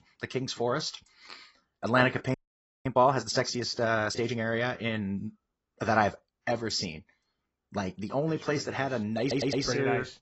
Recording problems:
garbled, watery; badly; nothing above 7.5 kHz
audio freezing; at 2.5 s for 0.5 s
audio stuttering; at 9 s

